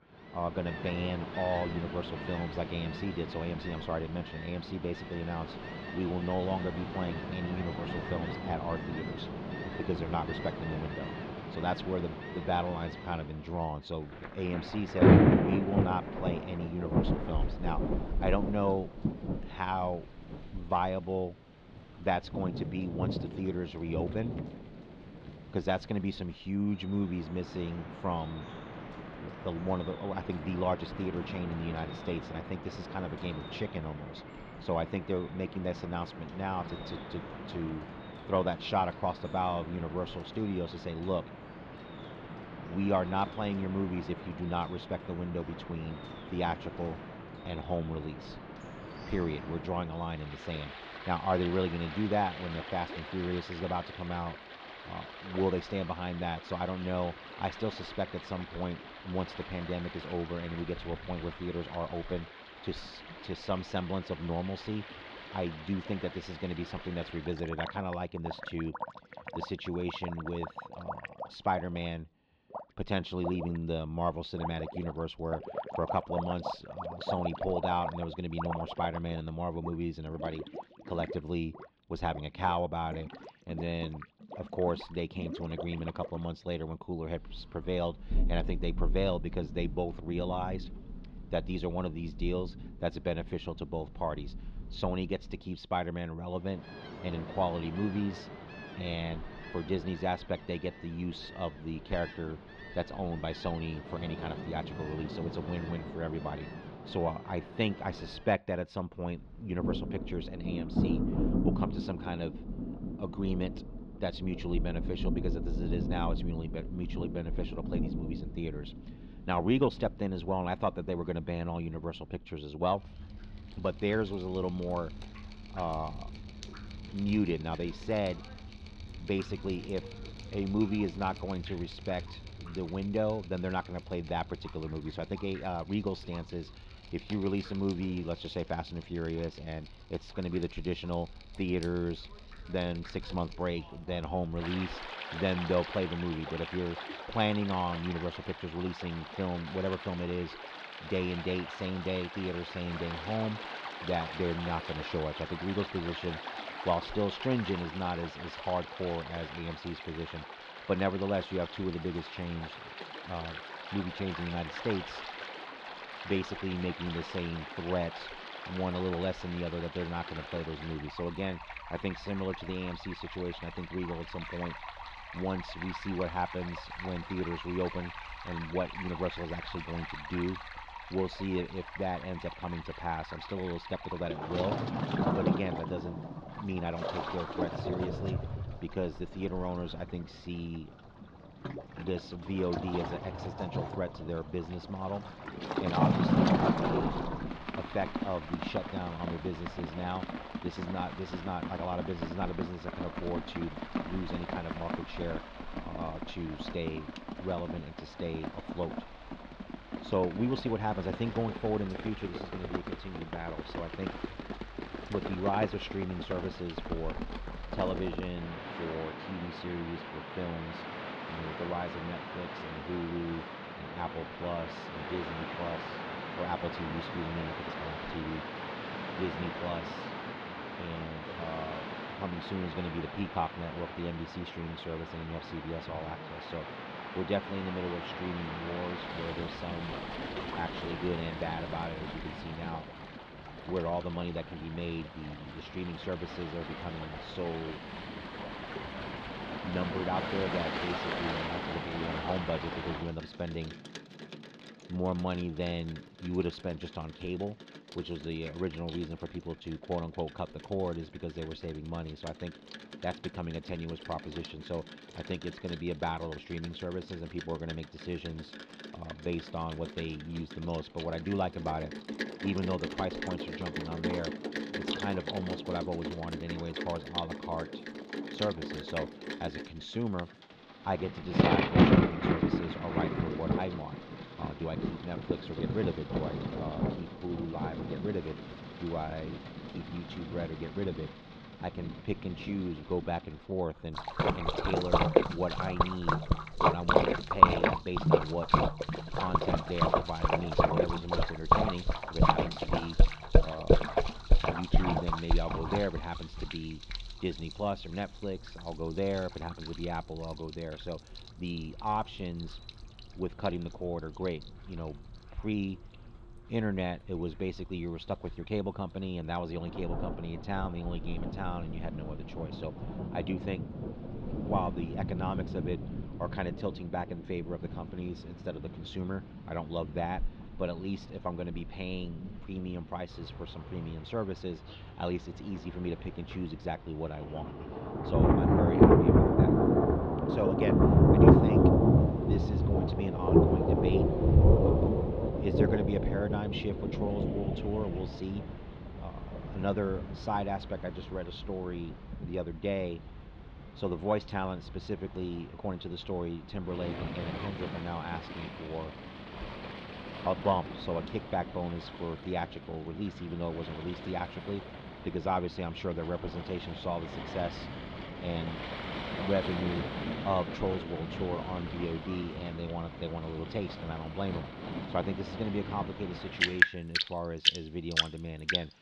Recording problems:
muffled; very slightly; fading above 4 kHz
rain or running water; very loud; throughout; 1 dB above the speech

